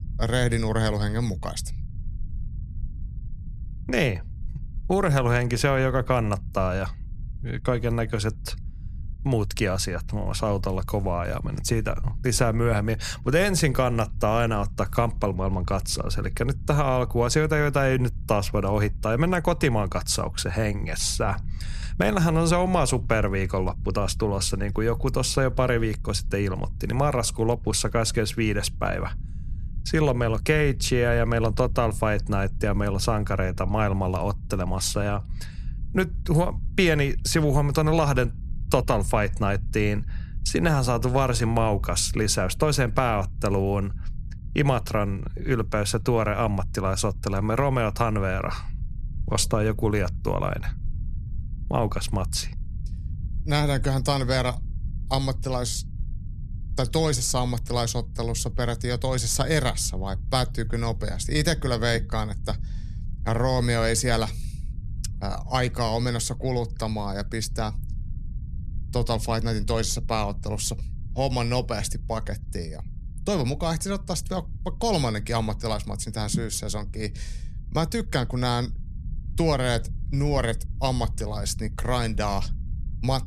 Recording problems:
low rumble; faint; throughout; 25 dB below the speech

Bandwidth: 14 kHz